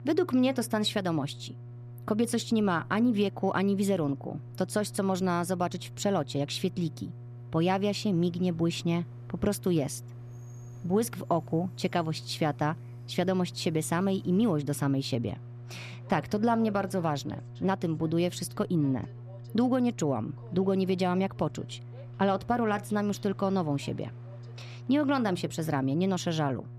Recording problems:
electrical hum; faint; throughout; 60 Hz, 25 dB below the speech
train or aircraft noise; faint; throughout; 30 dB below the speech

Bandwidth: 14 kHz